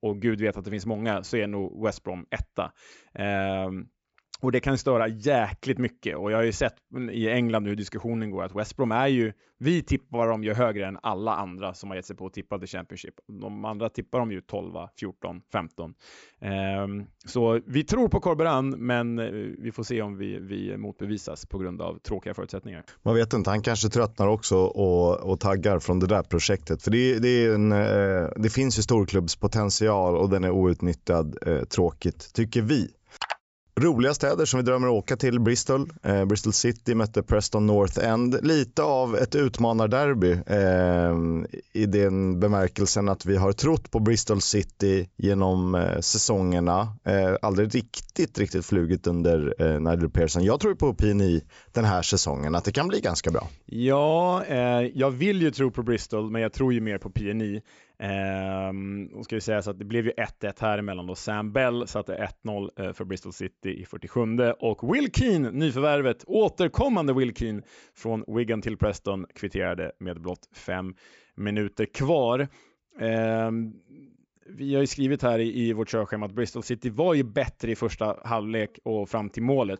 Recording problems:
high frequencies cut off; noticeable; nothing above 8 kHz

